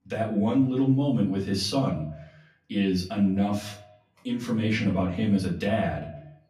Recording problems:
off-mic speech; far
echo of what is said; faint; throughout; 120 ms later, 20 dB below the speech
room echo; slight; dies away in 0.4 s

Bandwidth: 14.5 kHz